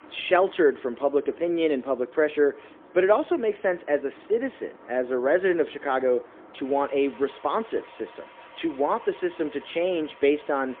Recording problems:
phone-call audio; poor line; nothing above 3.5 kHz
traffic noise; faint; throughout; 25 dB below the speech

